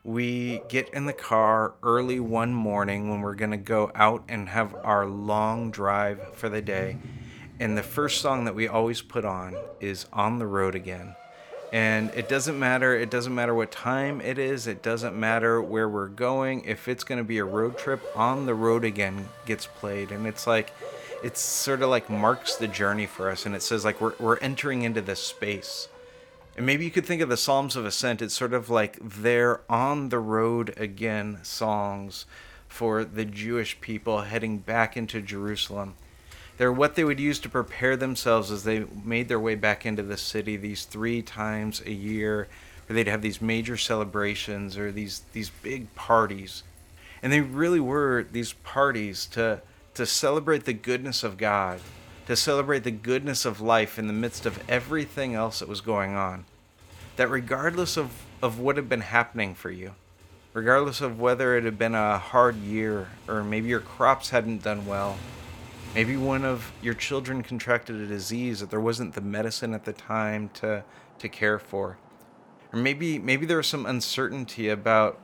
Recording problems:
animal sounds; noticeable; throughout; 15 dB below the speech
traffic noise; faint; throughout; 20 dB below the speech

